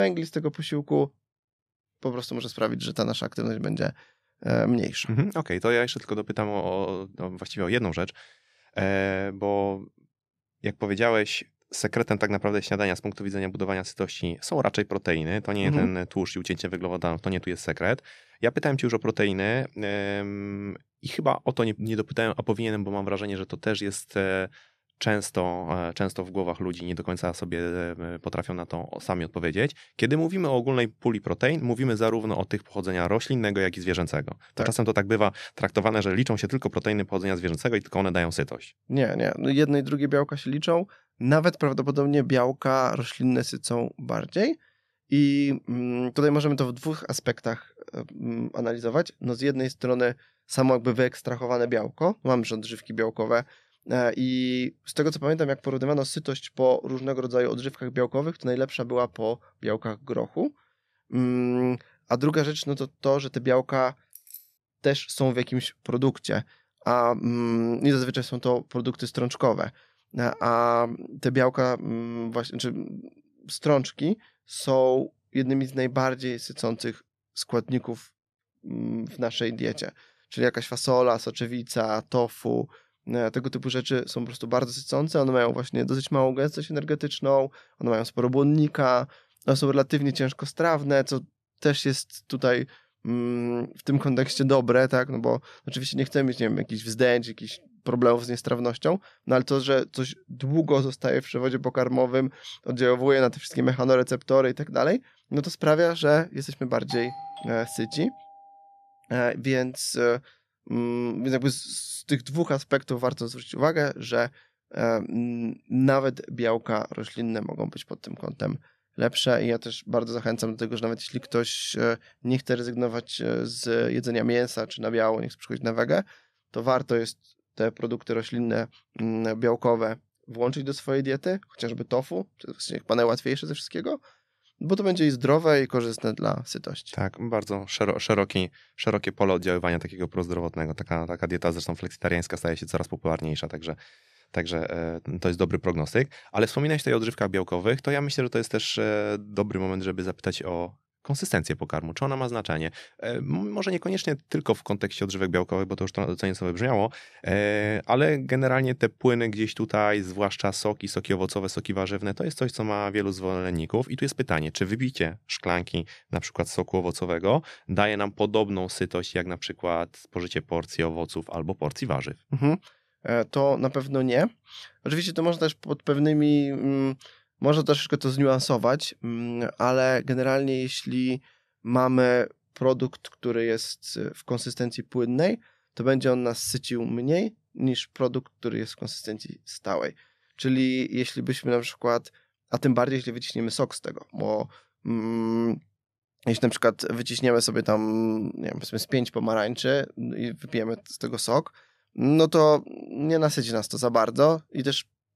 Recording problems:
abrupt cut into speech; at the start
jangling keys; faint; at 1:04; peak 20 dB below the speech
doorbell; faint; from 1:47 to 1:48; peak 10 dB below the speech

